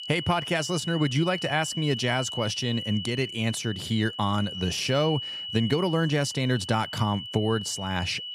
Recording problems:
high-pitched whine; loud; throughout; 3 kHz, 7 dB below the speech

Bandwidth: 14.5 kHz